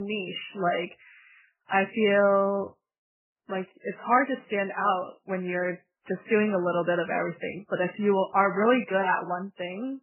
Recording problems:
garbled, watery; badly; nothing above 3 kHz
abrupt cut into speech; at the start

